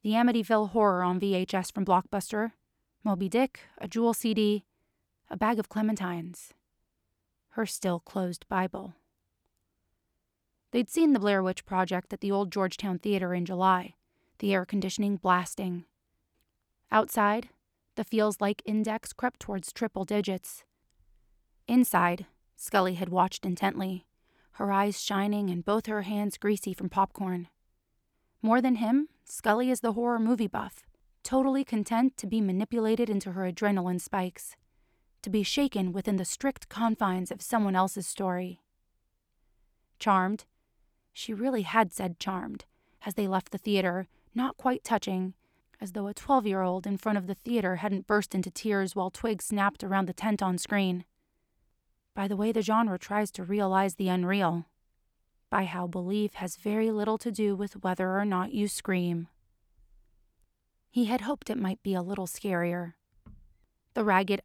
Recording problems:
none

